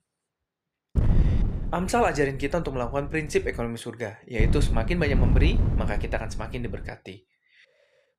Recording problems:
wind noise on the microphone; heavy; from 1 to 3.5 s and from 4.5 to 7 s; 10 dB below the speech

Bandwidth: 14.5 kHz